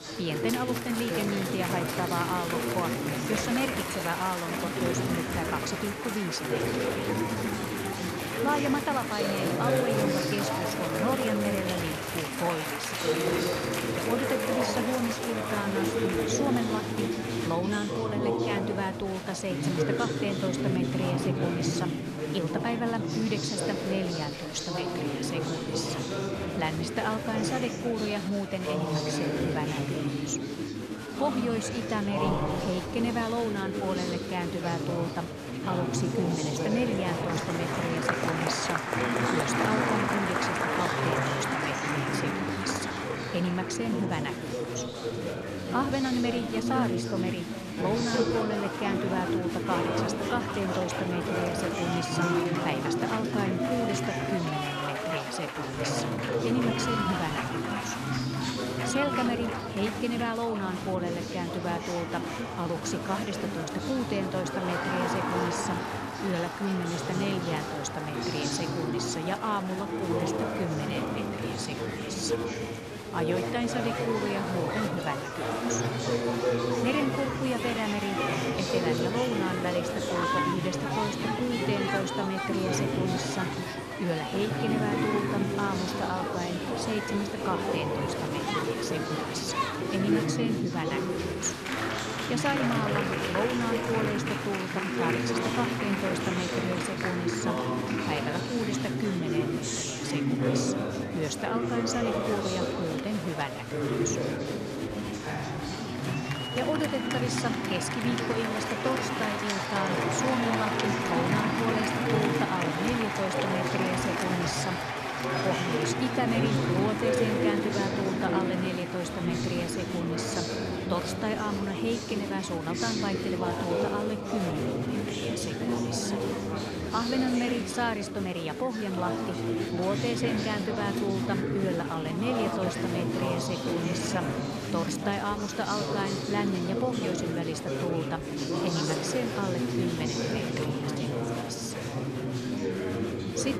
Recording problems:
chatter from many people; very loud; throughout; 2 dB above the speech

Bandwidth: 14 kHz